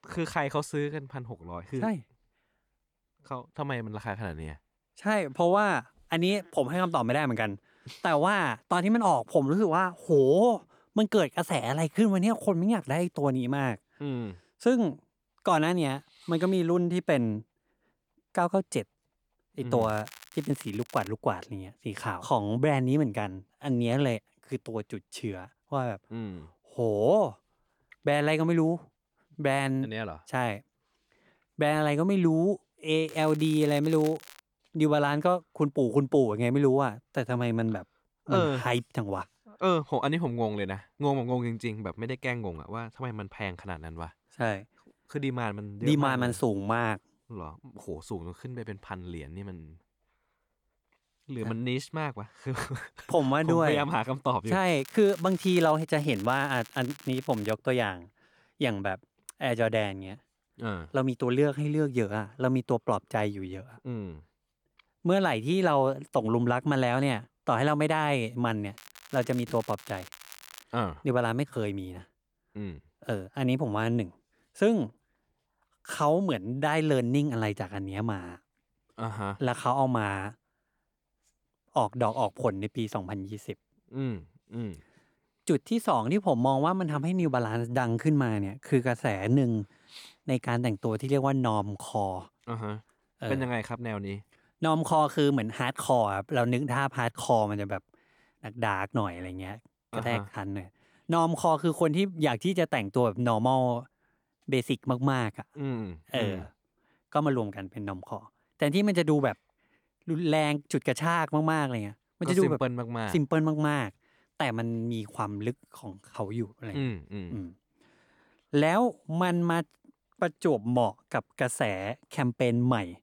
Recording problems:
crackling; noticeable; 4 times, first at 20 s; 20 dB below the speech

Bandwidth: 18.5 kHz